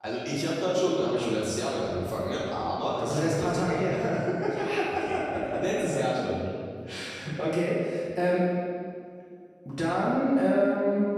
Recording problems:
room echo; strong; dies away in 1.9 s
off-mic speech; far

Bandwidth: 14.5 kHz